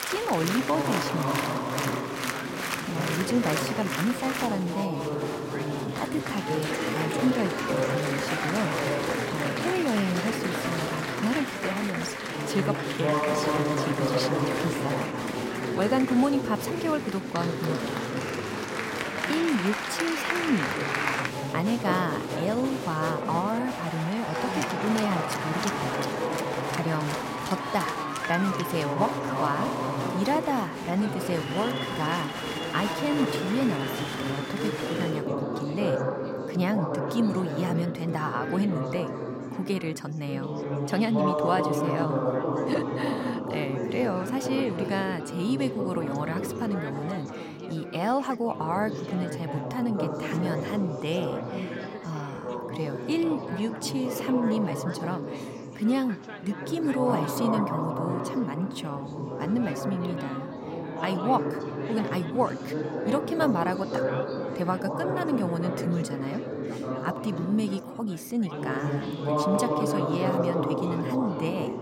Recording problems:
chatter from many people; loud; throughout; as loud as the speech

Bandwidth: 16 kHz